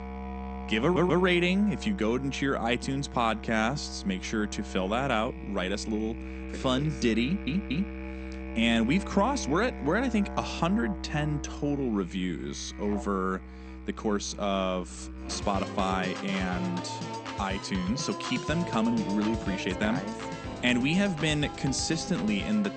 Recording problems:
garbled, watery; slightly; nothing above 8.5 kHz
background music; loud; throughout; 9 dB below the speech
audio stuttering; at 1 s and at 7 s

